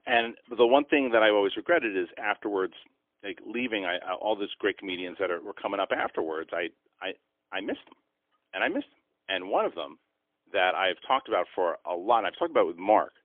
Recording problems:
phone-call audio; poor line; nothing above 3.5 kHz

